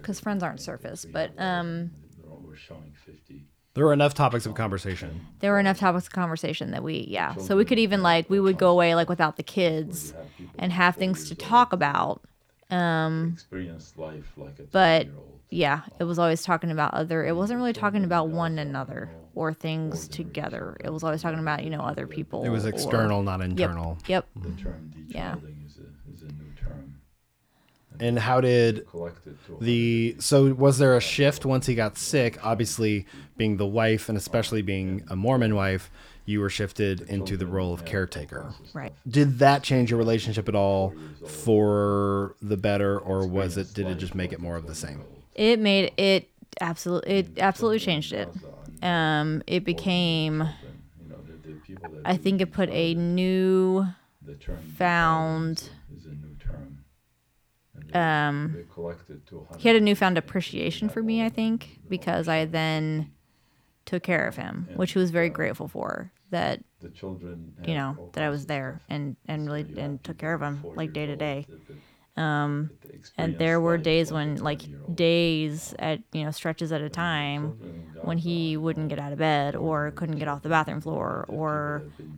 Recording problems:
voice in the background; noticeable; throughout; 20 dB below the speech

